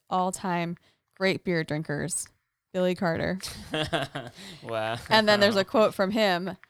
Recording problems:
household noises; faint; throughout; 30 dB below the speech

